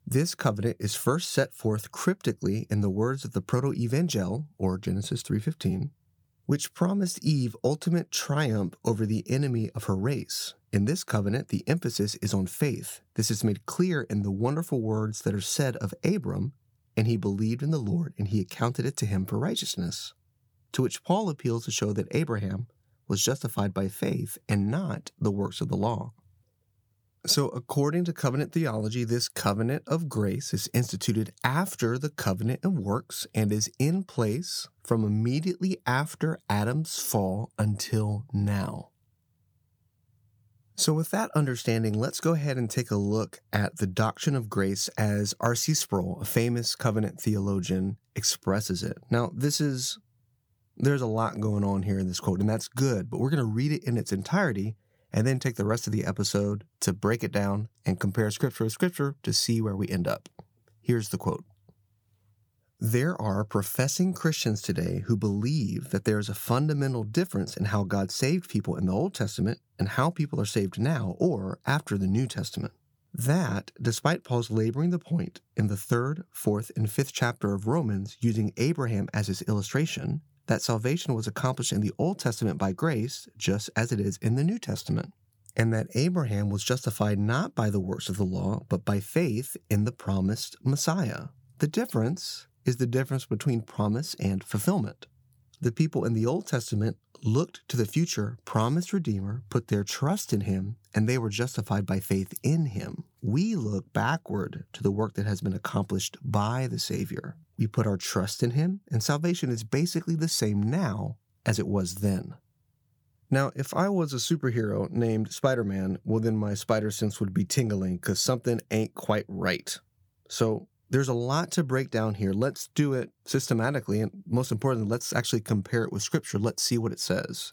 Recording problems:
none

